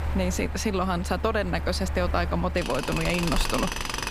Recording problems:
machinery noise; loud; throughout; 4 dB below the speech

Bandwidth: 15 kHz